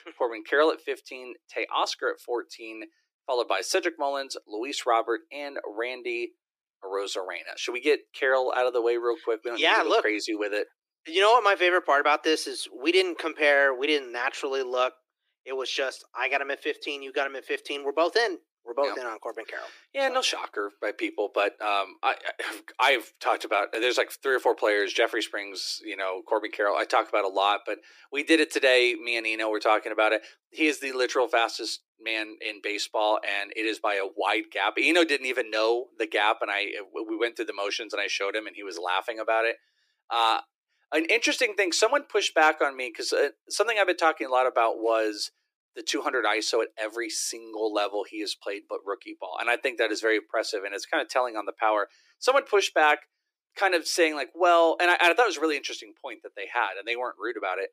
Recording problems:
thin; very; fading below 300 Hz

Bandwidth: 15 kHz